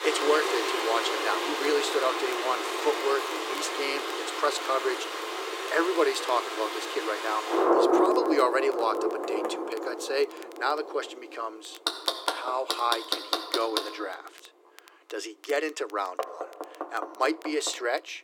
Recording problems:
thin; very; fading below 300 Hz
rain or running water; very loud; throughout; as loud as the speech
household noises; loud; throughout; 4 dB below the speech
crackle, like an old record; faint; 25 dB below the speech

